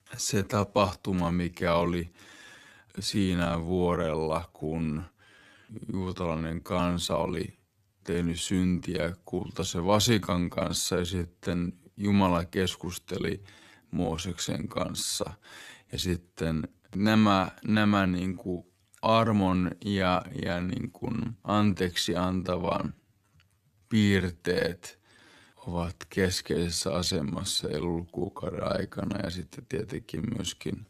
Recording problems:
wrong speed, natural pitch; too slow; 0.6 times normal speed

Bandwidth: 13.5 kHz